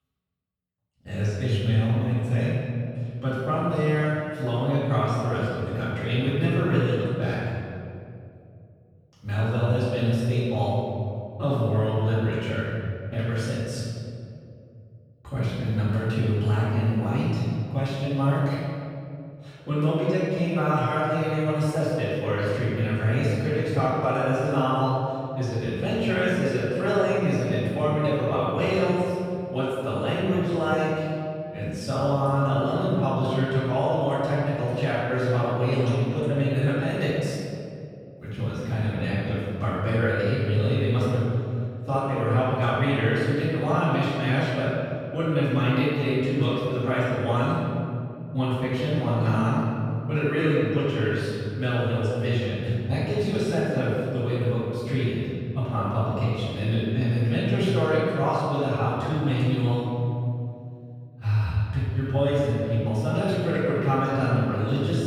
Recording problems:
room echo; strong; dies away in 2.4 s
off-mic speech; far

